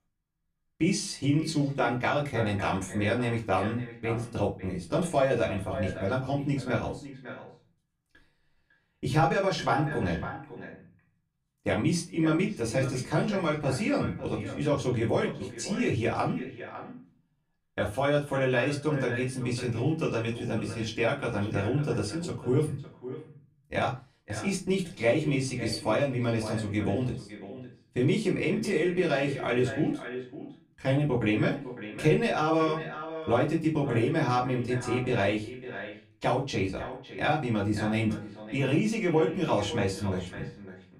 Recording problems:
off-mic speech; far
echo of what is said; noticeable; throughout; 550 ms later, 15 dB below the speech
room echo; very slight; dies away in 0.2 s

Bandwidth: 15 kHz